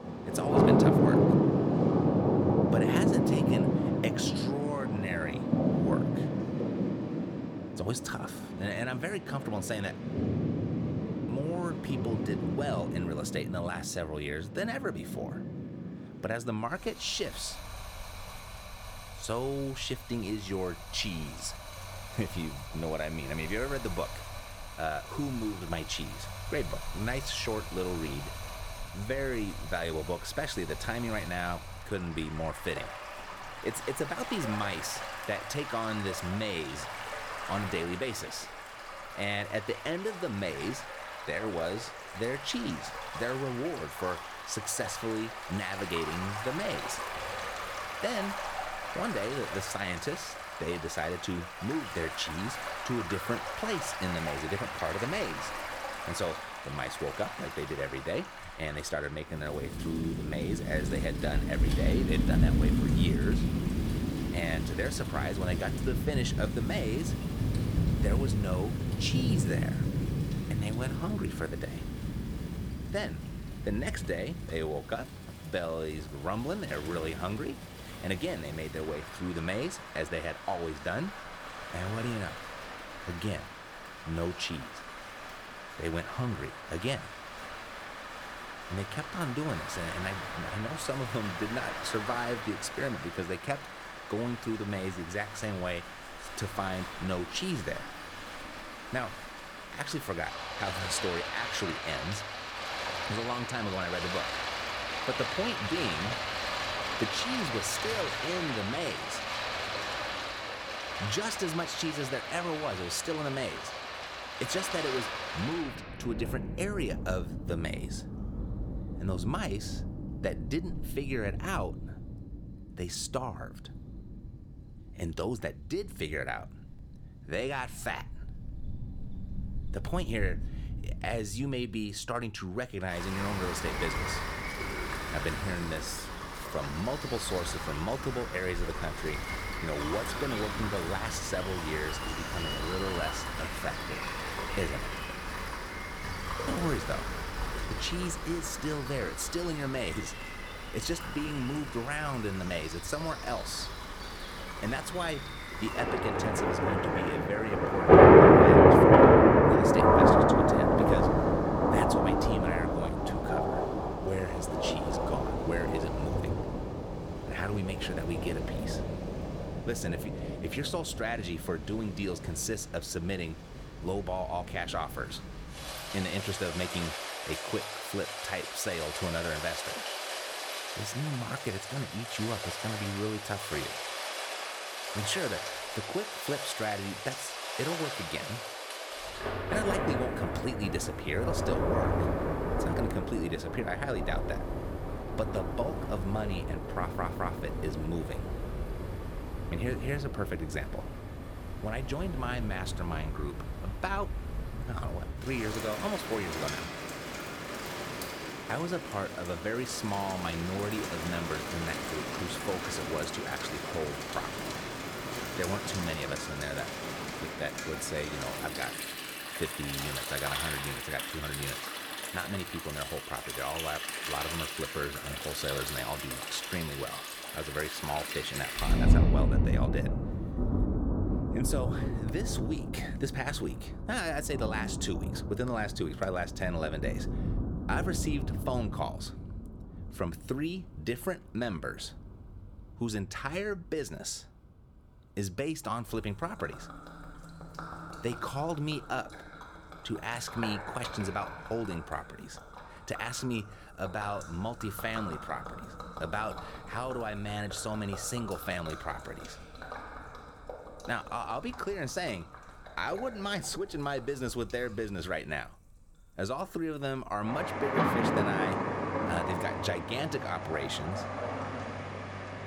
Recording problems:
rain or running water; very loud; throughout; 4 dB above the speech
audio stuttering; at 3:17

